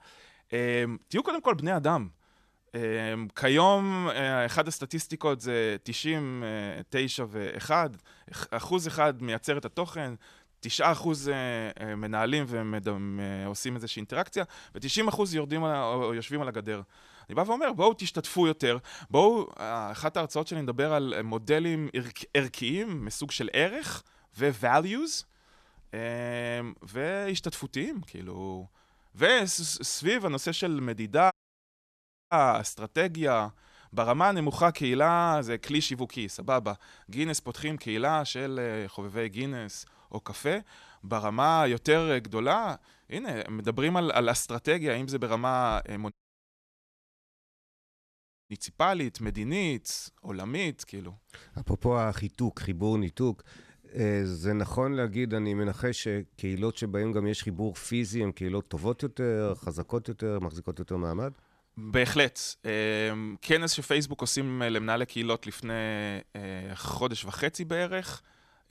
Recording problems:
audio cutting out; at 31 s for 1 s and at 46 s for 2.5 s

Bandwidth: 14 kHz